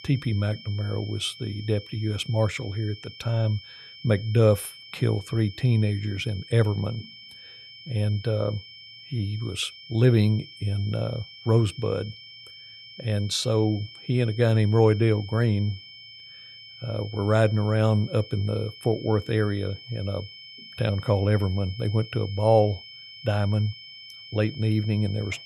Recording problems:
high-pitched whine; noticeable; throughout; 3 kHz, 15 dB below the speech

